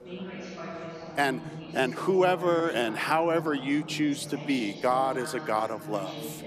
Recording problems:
chatter from many people; noticeable; throughout; 10 dB below the speech

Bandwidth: 14.5 kHz